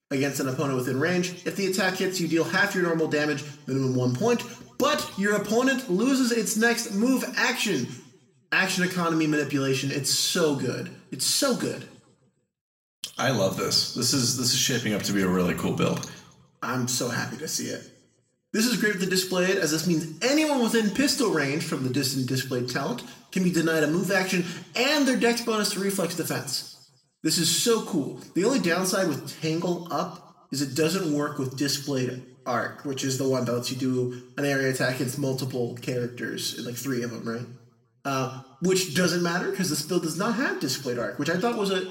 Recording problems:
off-mic speech; far
room echo; slight; dies away in 0.7 s

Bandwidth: 16 kHz